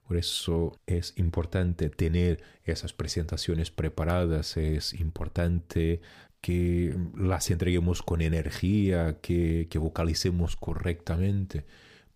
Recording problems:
none

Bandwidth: 15 kHz